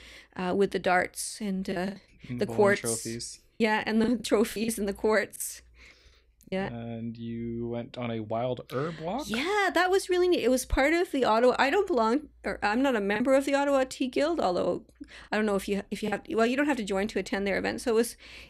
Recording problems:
choppy; very; at 1.5 s, from 3.5 to 6.5 s and from 13 to 16 s; 6% of the speech affected

